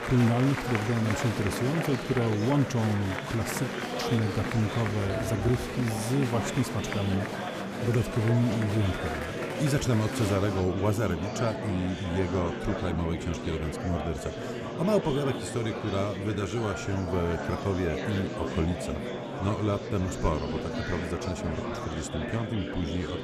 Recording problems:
murmuring crowd; loud; throughout; 4 dB below the speech

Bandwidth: 14.5 kHz